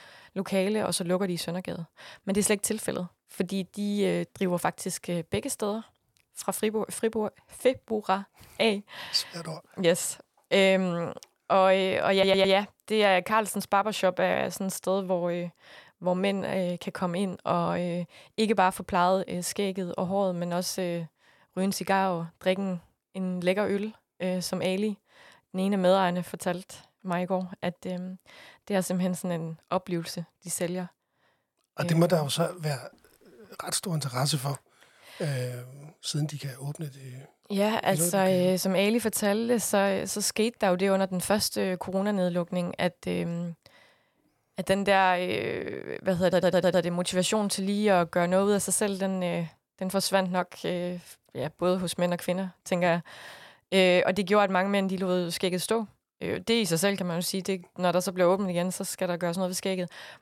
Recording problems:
audio stuttering; at 12 s and at 46 s

